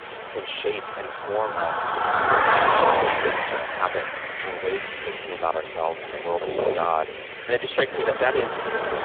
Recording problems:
phone-call audio; poor line
traffic noise; very loud; throughout; 3 dB above the speech

